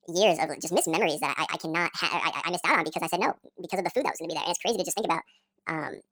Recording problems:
wrong speed and pitch; too fast and too high; 1.7 times normal speed

